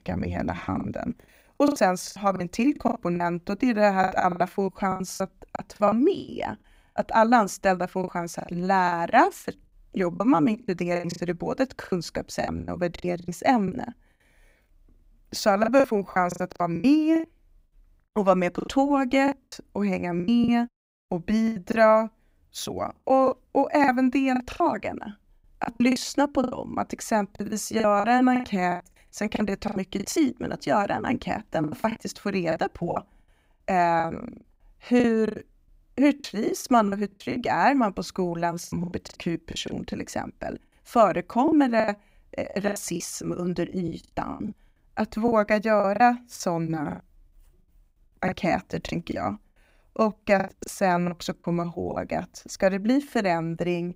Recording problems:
choppy; very; 14% of the speech affected

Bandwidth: 15.5 kHz